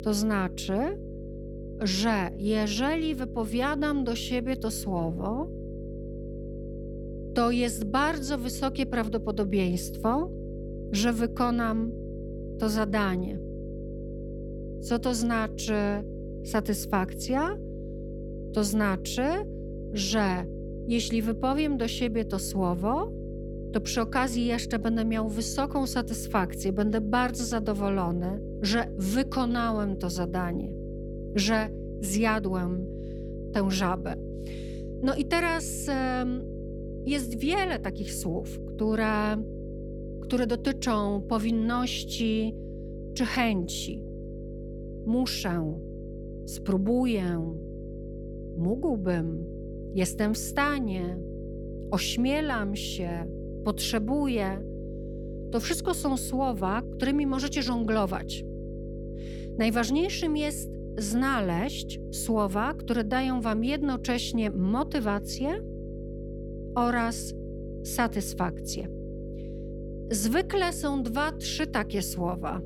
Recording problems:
electrical hum; noticeable; throughout; 50 Hz, 15 dB below the speech

